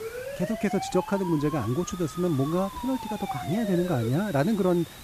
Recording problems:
hiss; noticeable; throughout; 15 dB below the speech
siren; noticeable; until 4 s; peak 8 dB below the speech

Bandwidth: 14.5 kHz